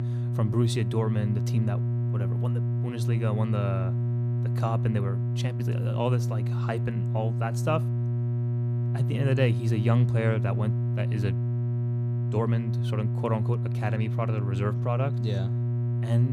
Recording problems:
electrical hum; loud; throughout; 60 Hz, 5 dB below the speech
abrupt cut into speech; at the end

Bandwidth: 14.5 kHz